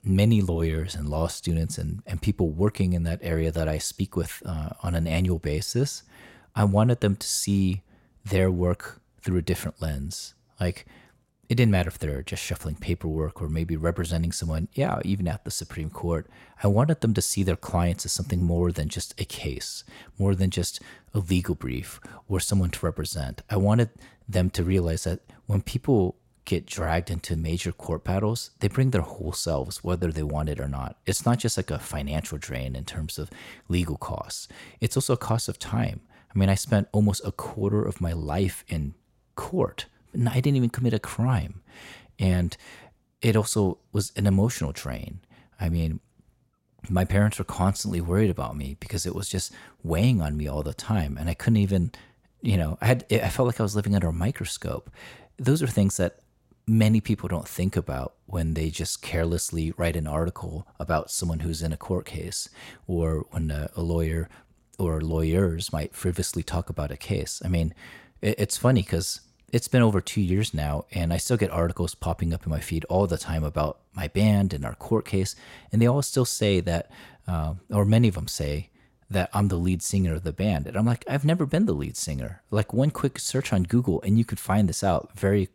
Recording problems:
none

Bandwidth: 16 kHz